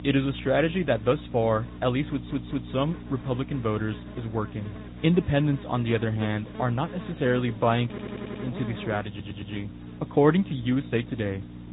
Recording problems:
high frequencies cut off; severe; nothing above 4 kHz
garbled, watery; slightly
electrical hum; noticeable; throughout; 60 Hz, 15 dB below the speech
hiss; faint; throughout; 30 dB below the speech
audio stuttering; at 2 s, at 8 s and at 9 s

